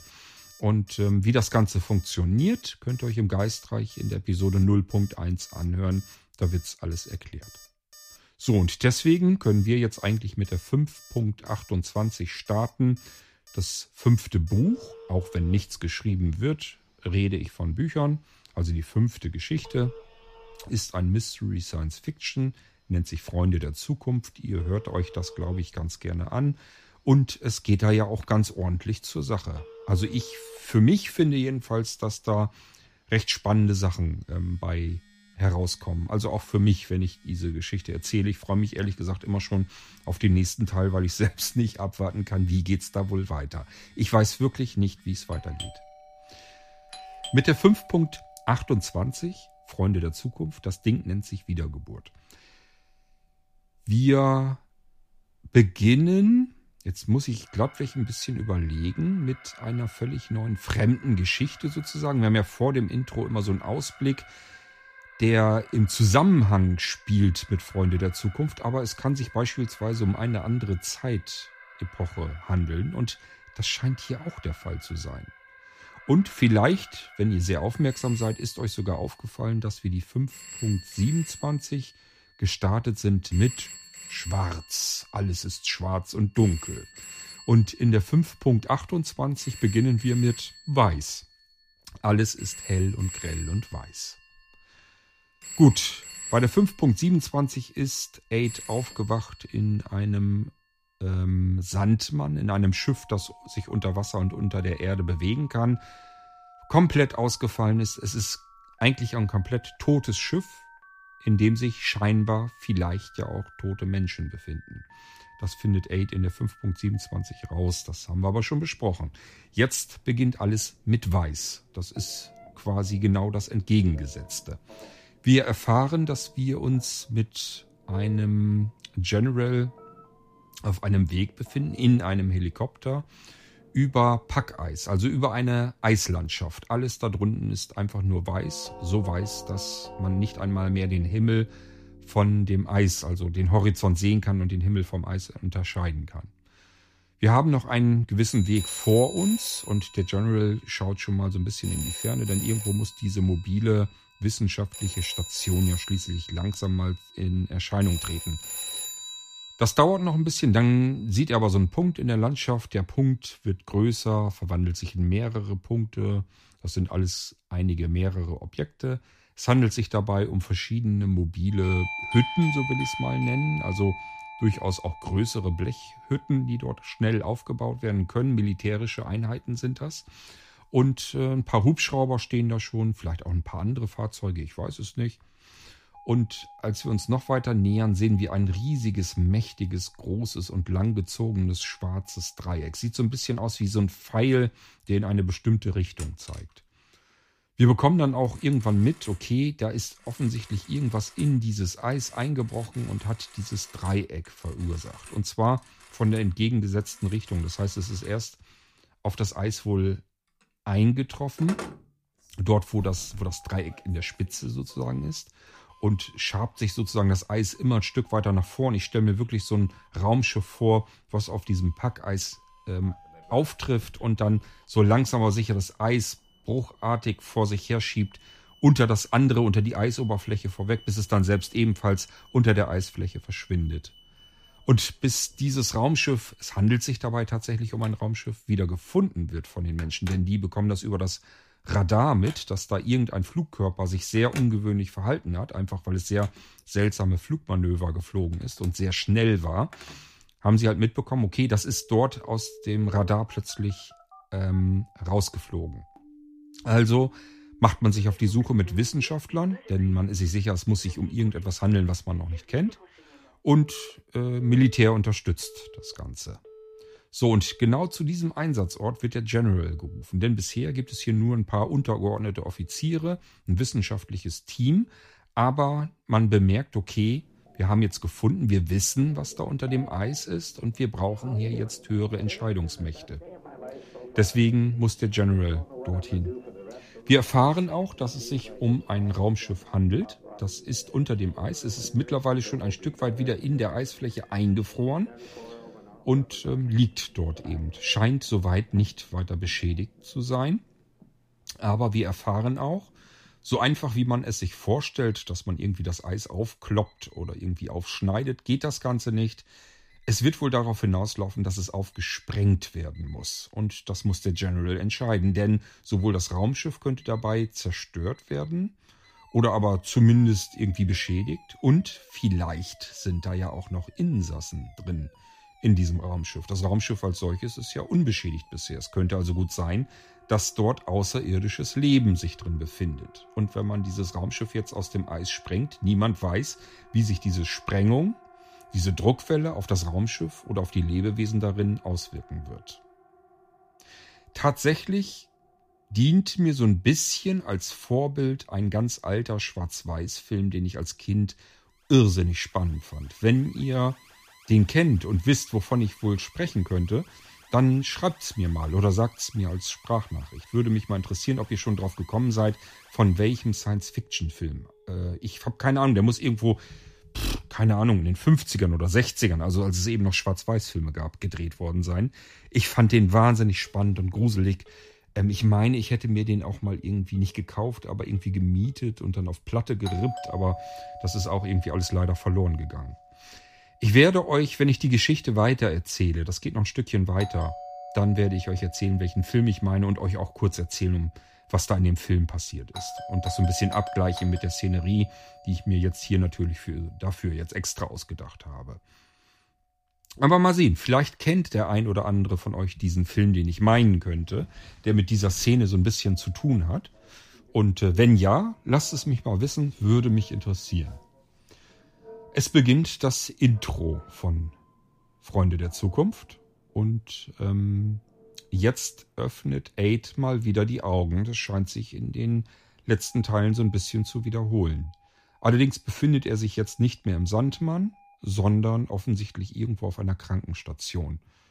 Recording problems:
alarms or sirens; noticeable; throughout; 20 dB below the speech

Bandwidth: 15 kHz